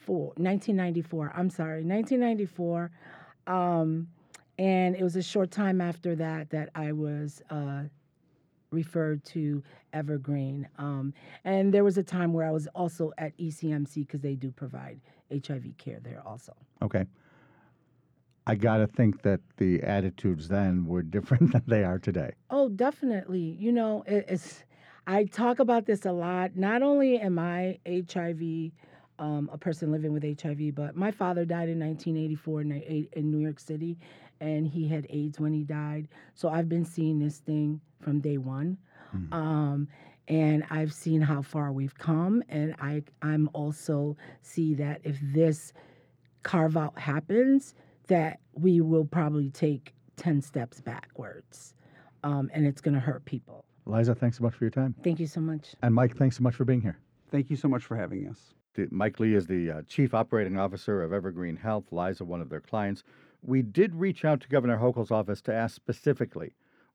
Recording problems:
muffled; slightly; fading above 2 kHz

